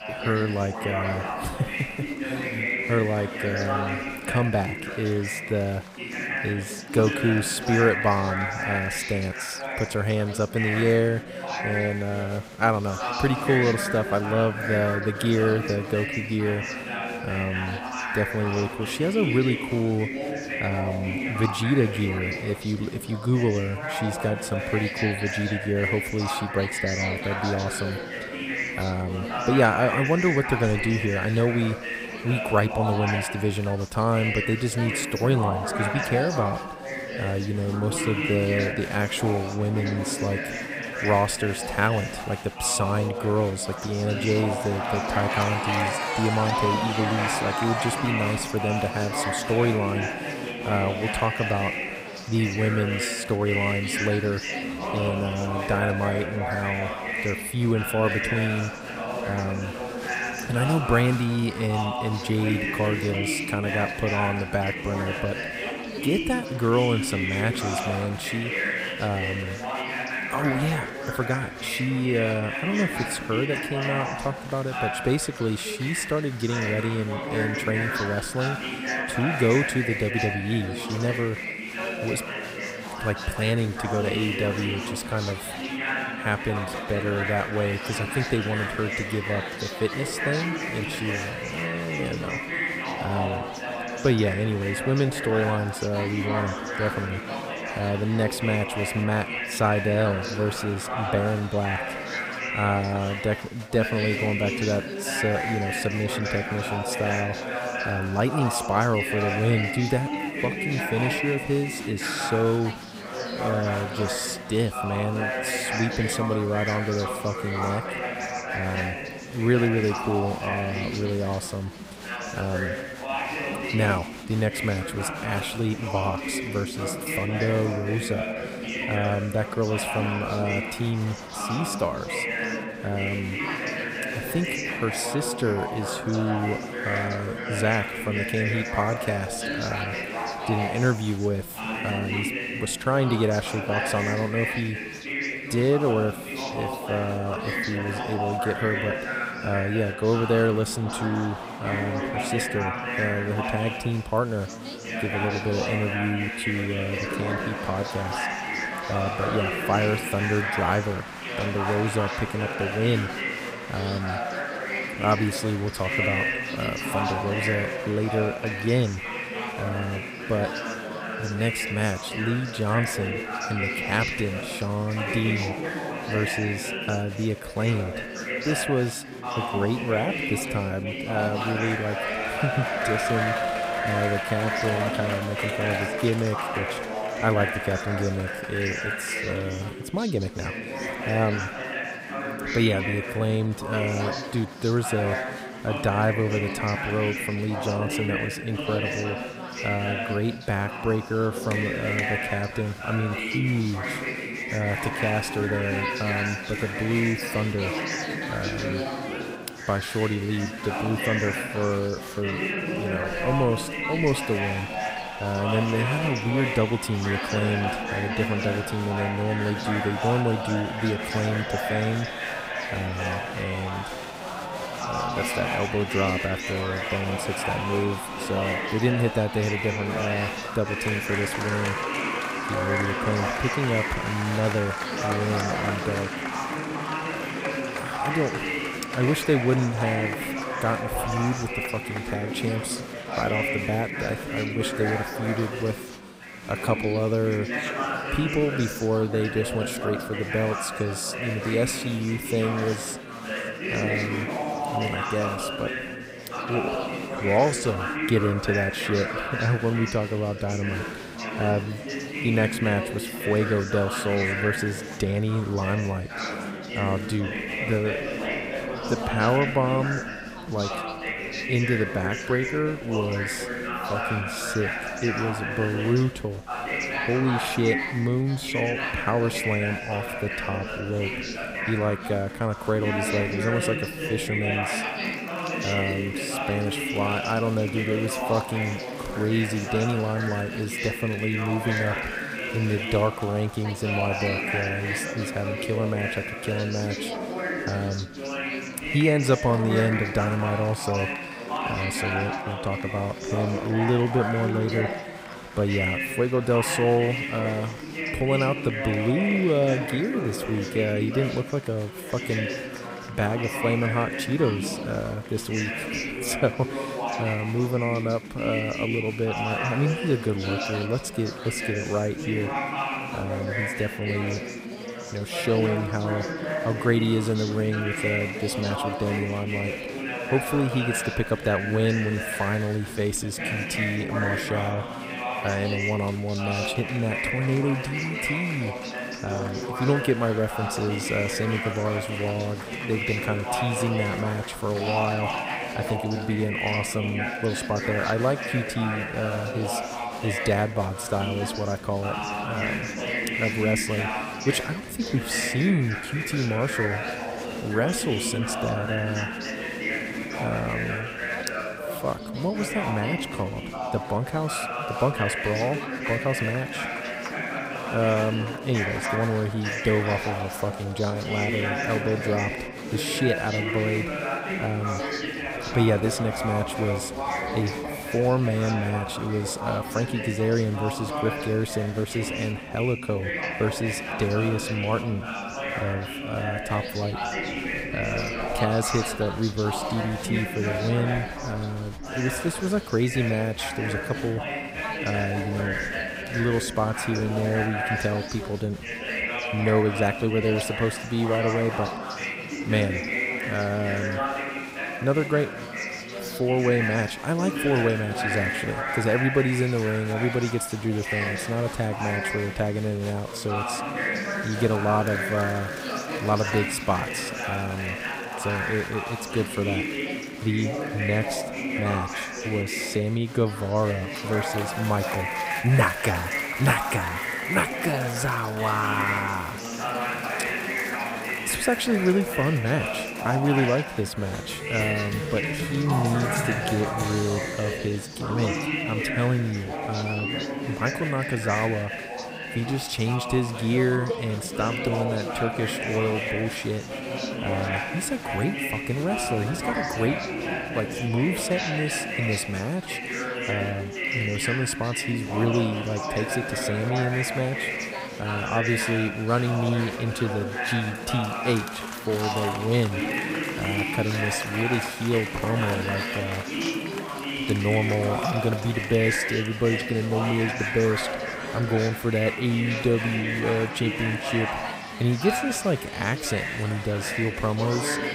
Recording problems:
chatter from many people; loud; throughout; 2 dB below the speech

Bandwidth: 15.5 kHz